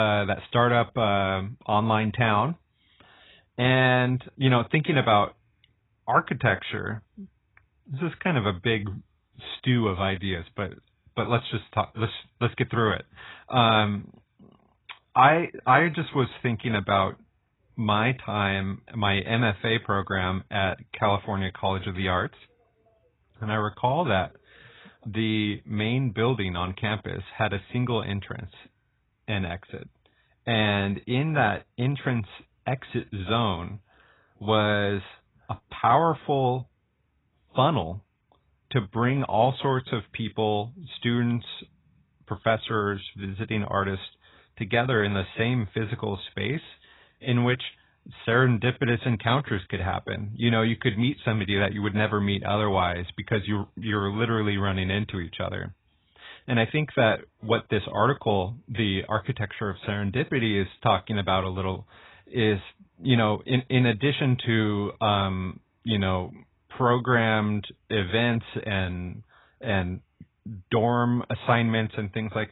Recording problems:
garbled, watery; badly; nothing above 4 kHz
abrupt cut into speech; at the start

